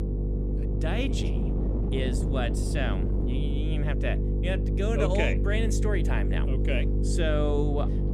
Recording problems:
electrical hum; loud; throughout; 50 Hz, 6 dB below the speech
wind noise on the microphone; occasional gusts; 10 dB below the speech

